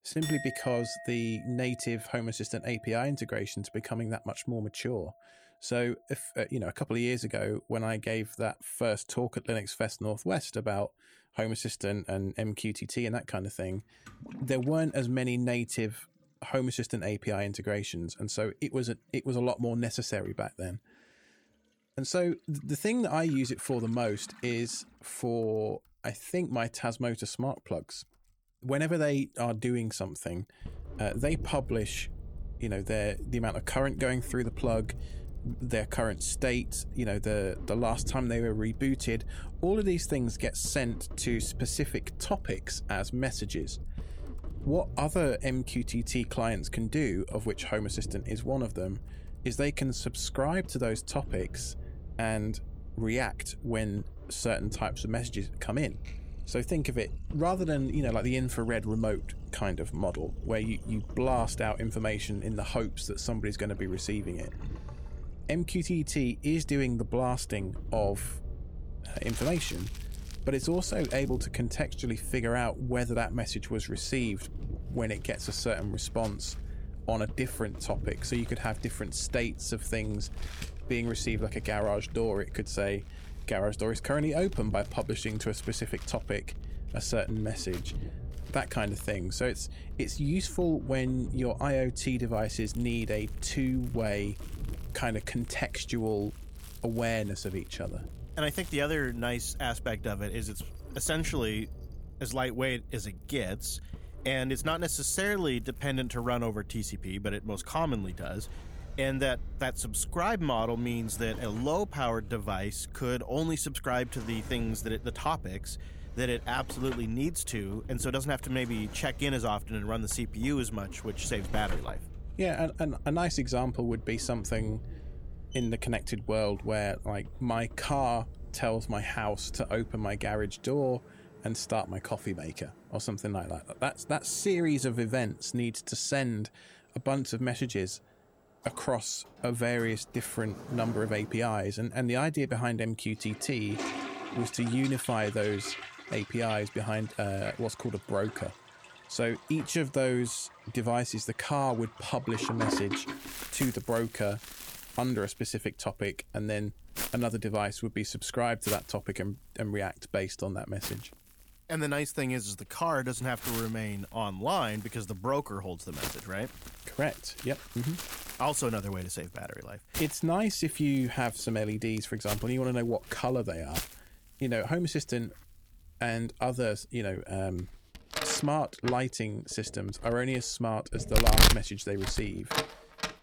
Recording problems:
household noises; loud; throughout; 7 dB below the speech
low rumble; faint; from 31 s to 2:11; 20 dB below the speech

